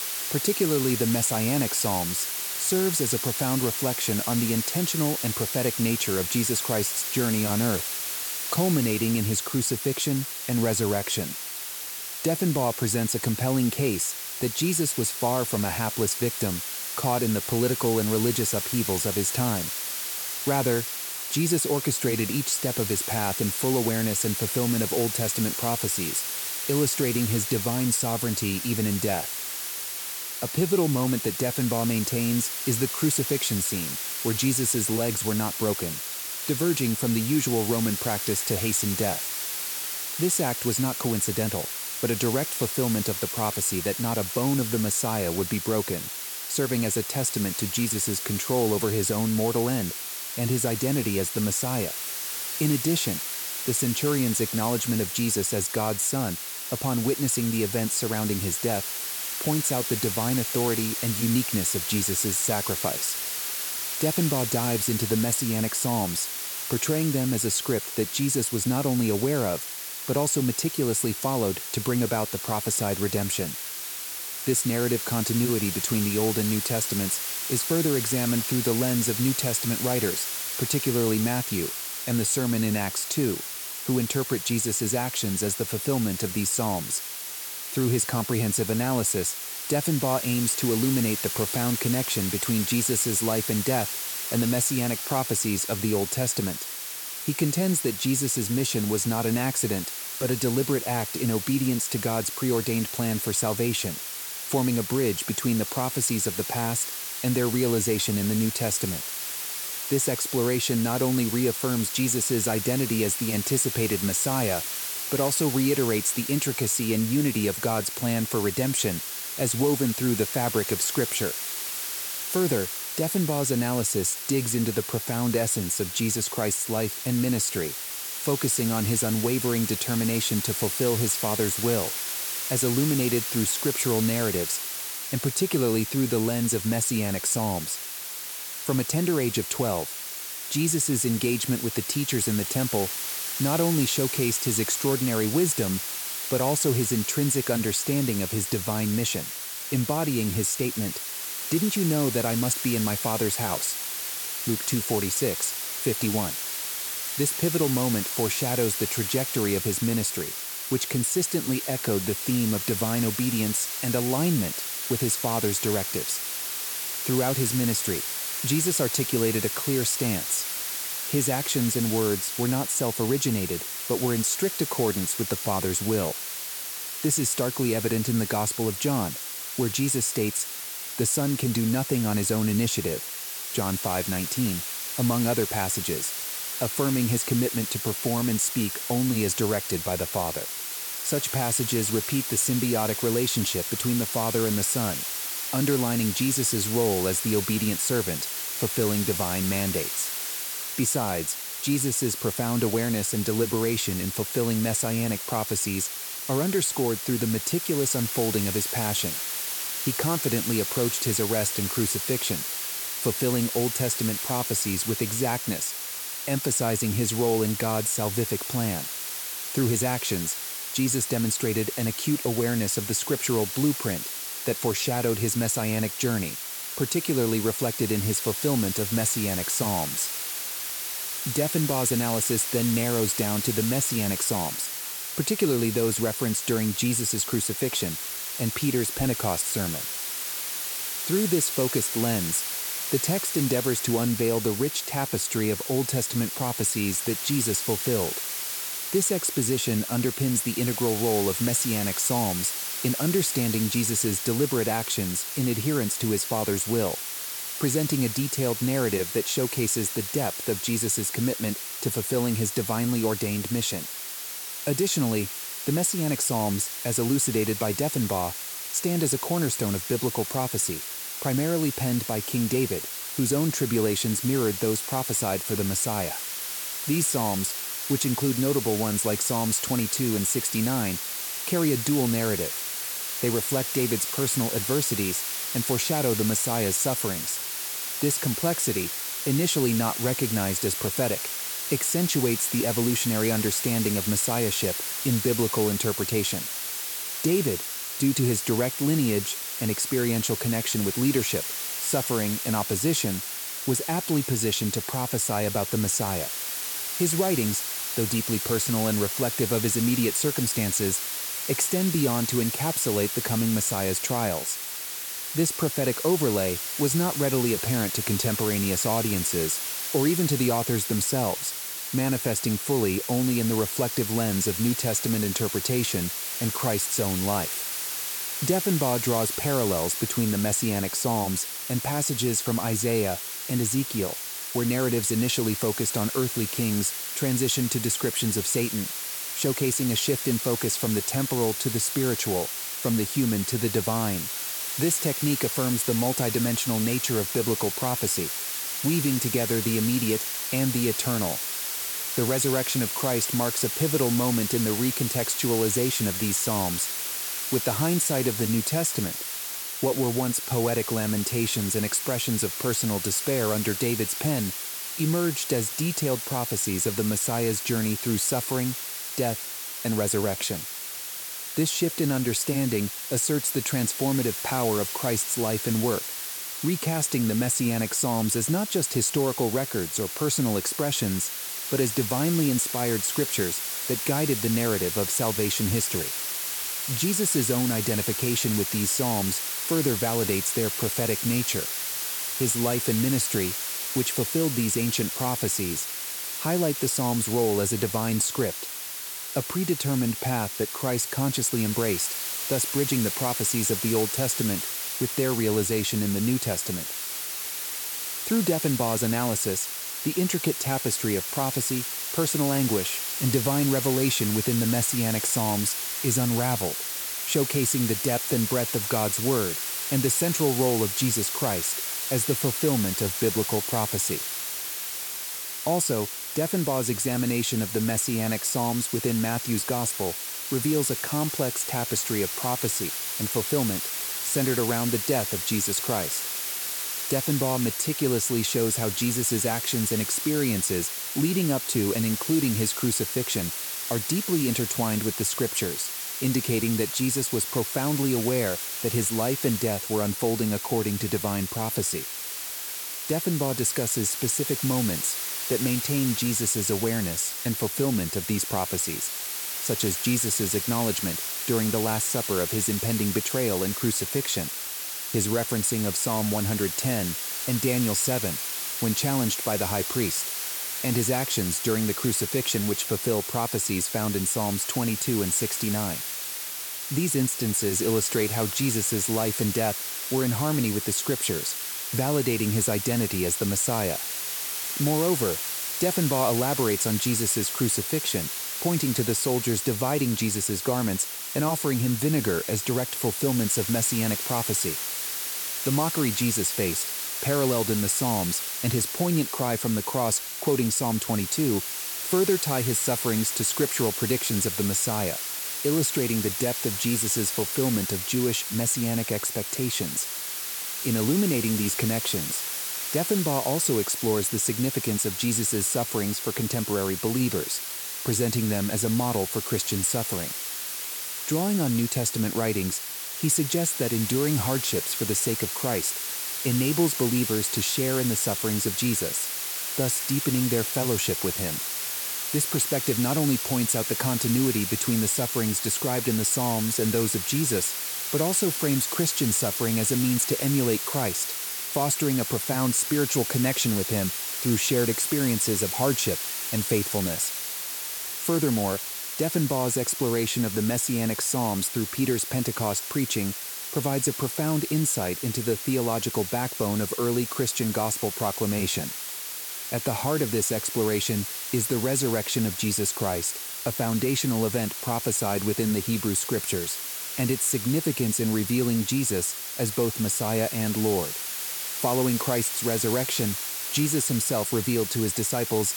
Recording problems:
hiss; loud; throughout; 3 dB below the speech

